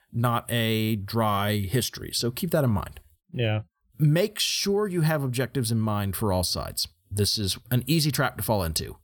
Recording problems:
none

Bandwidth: 18 kHz